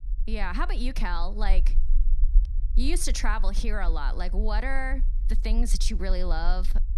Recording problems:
low rumble; faint; throughout; 20 dB below the speech

